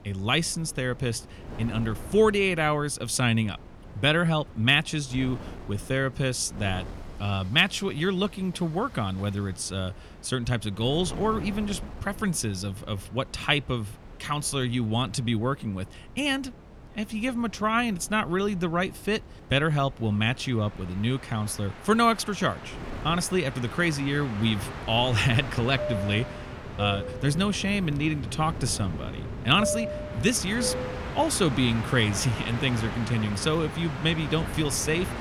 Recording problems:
train or aircraft noise; loud; throughout; 10 dB below the speech
wind noise on the microphone; occasional gusts; 20 dB below the speech

